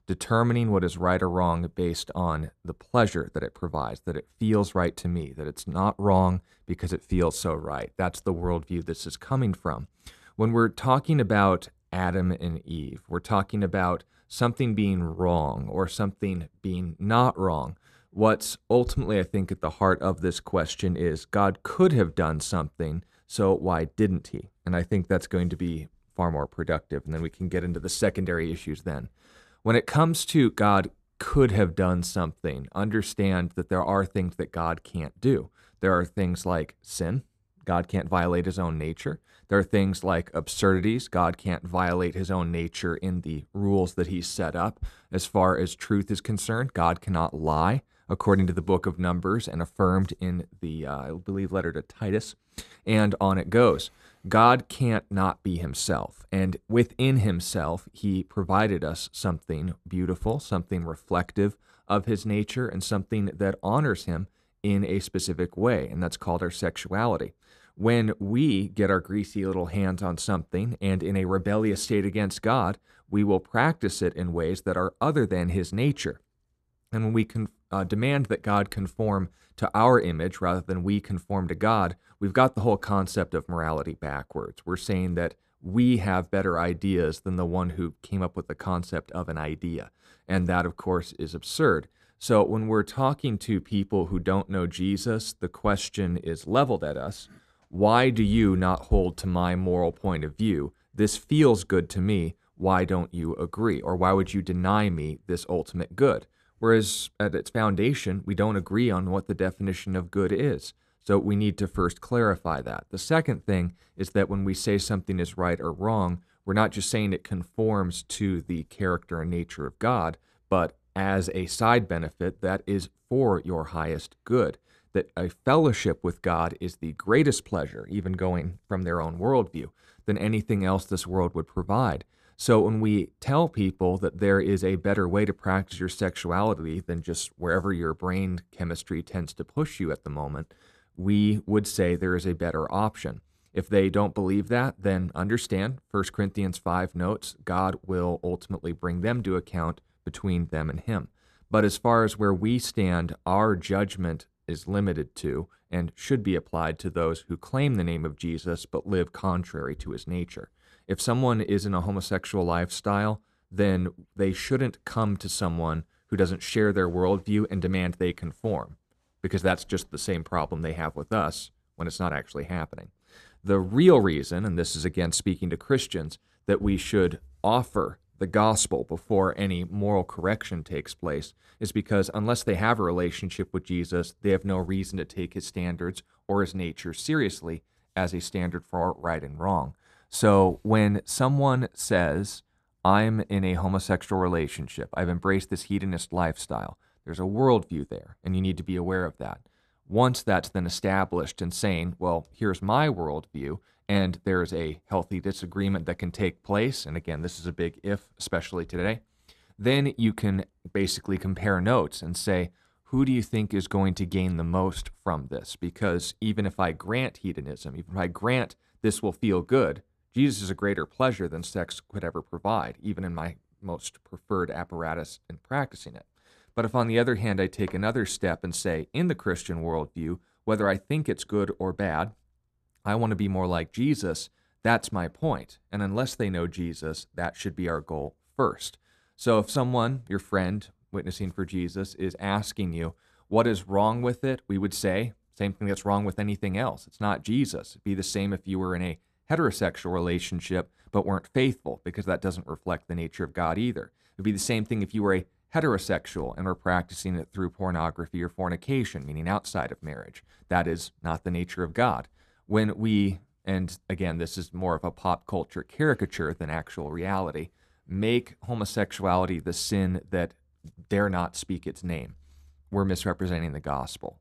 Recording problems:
none

